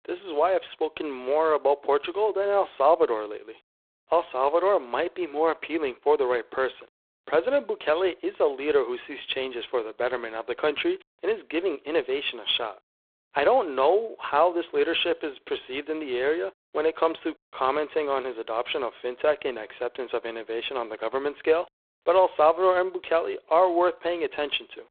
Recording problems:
phone-call audio; poor line; nothing above 3.5 kHz

